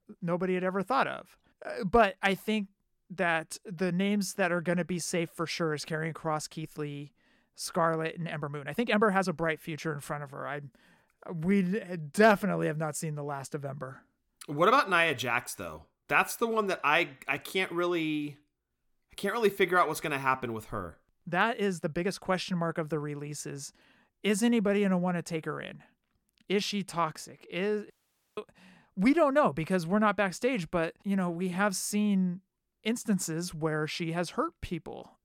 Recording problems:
uneven, jittery; strongly; from 6 to 27 s
audio cutting out; at 28 s

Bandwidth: 17.5 kHz